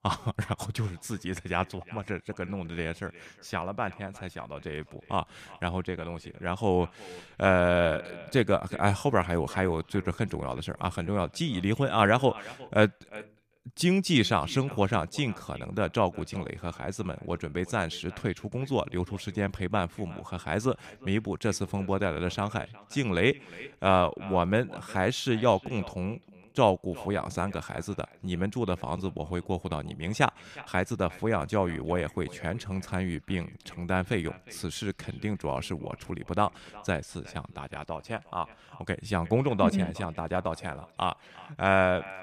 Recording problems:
echo of what is said; faint; throughout; 360 ms later, 20 dB below the speech

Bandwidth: 15 kHz